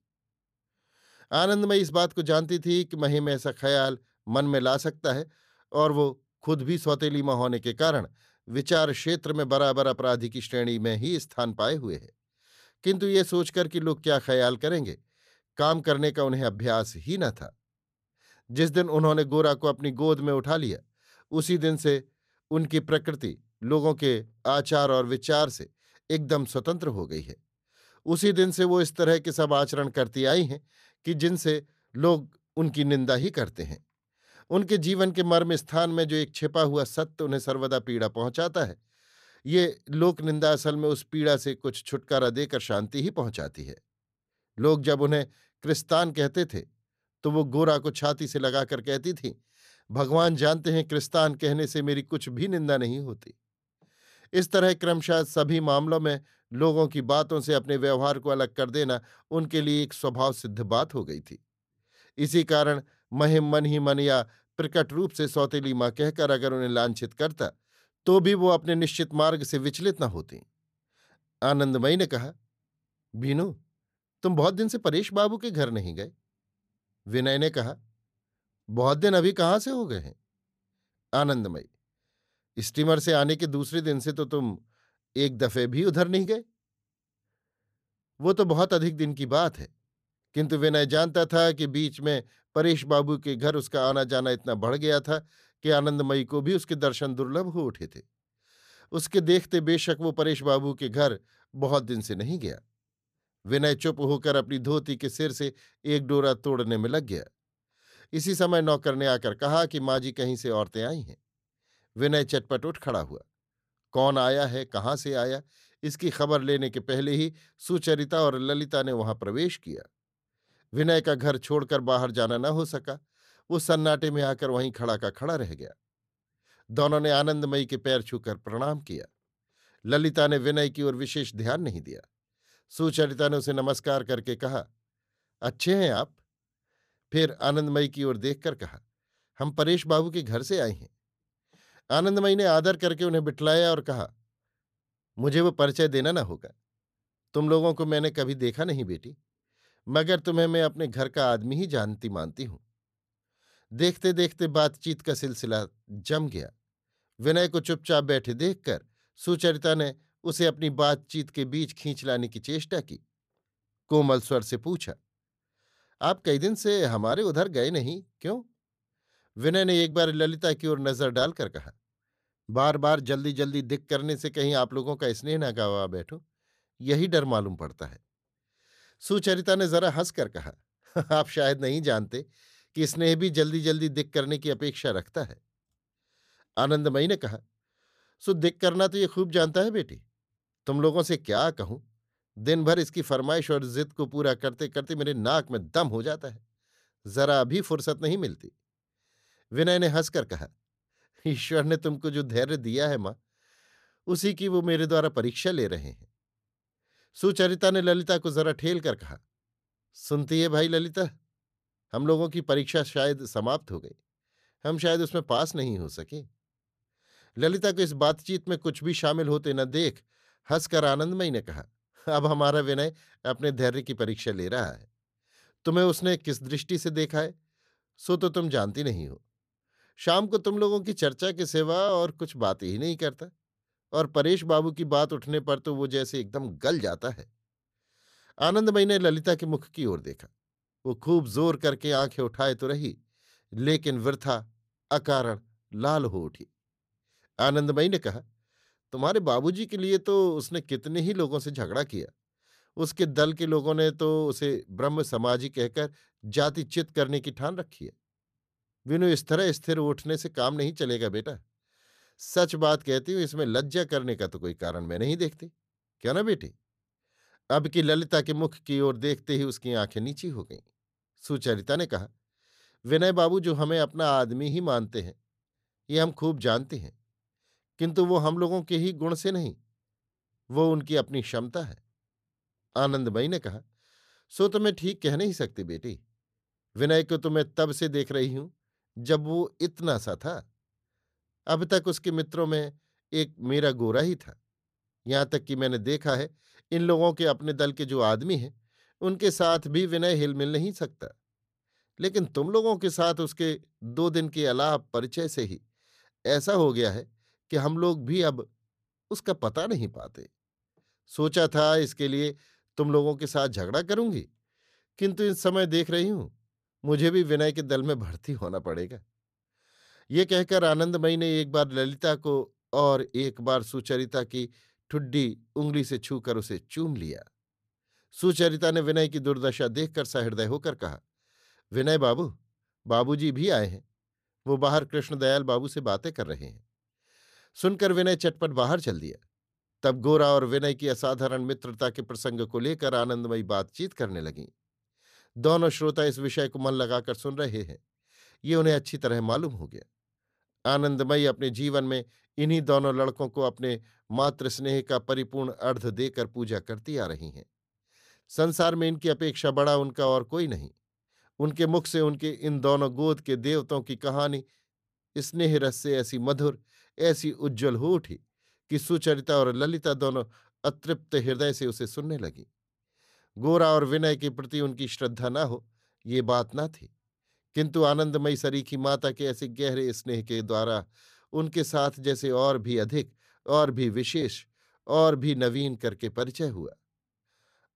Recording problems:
none

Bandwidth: 14.5 kHz